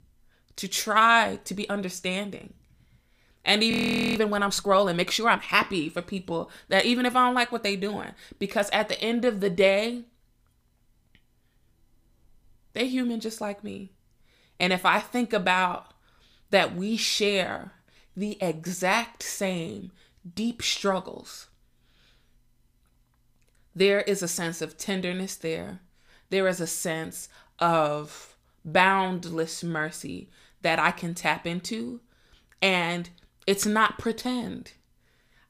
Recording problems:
audio freezing; at 3.5 s

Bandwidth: 15 kHz